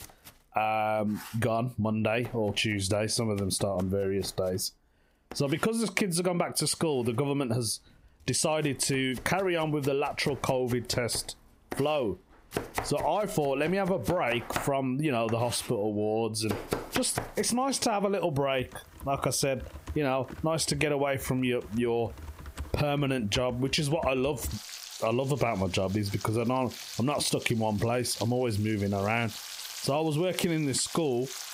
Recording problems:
squashed, flat; heavily, background pumping
household noises; noticeable; throughout; 15 dB below the speech

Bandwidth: 15.5 kHz